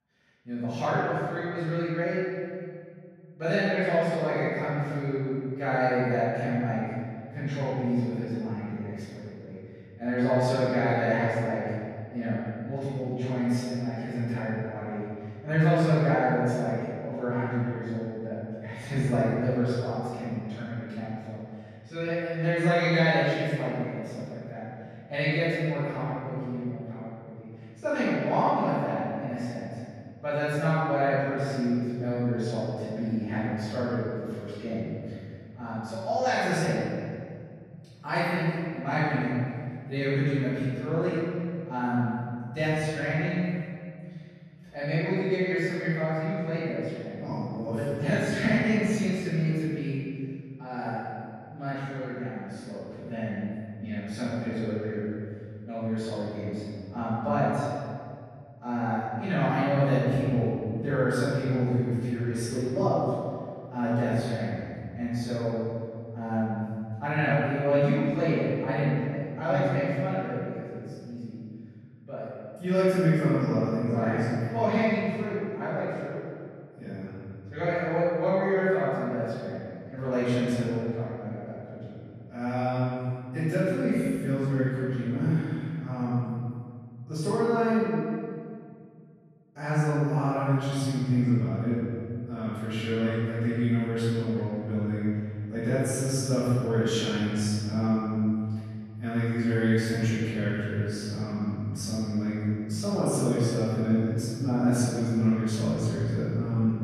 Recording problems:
room echo; strong; dies away in 2.2 s
off-mic speech; far

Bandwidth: 14.5 kHz